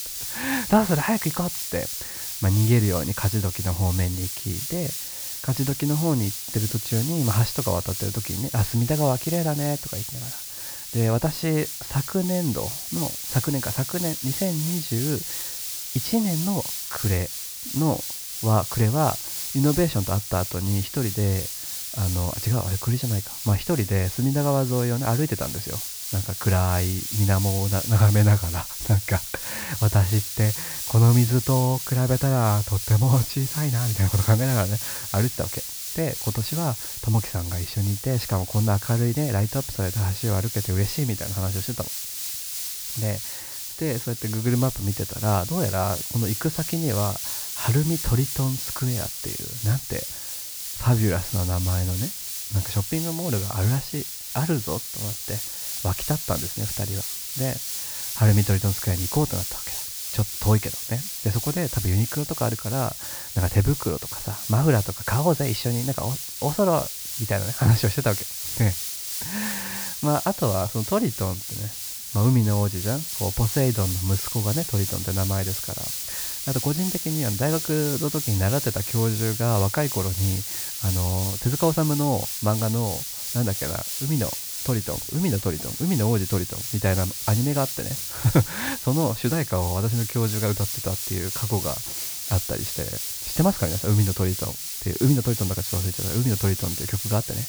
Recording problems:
high frequencies cut off; noticeable; nothing above 5.5 kHz
hiss; loud; throughout; 4 dB below the speech

